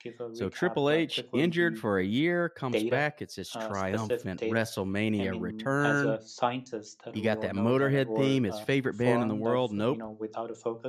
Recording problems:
voice in the background; loud; throughout; 6 dB below the speech

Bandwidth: 13.5 kHz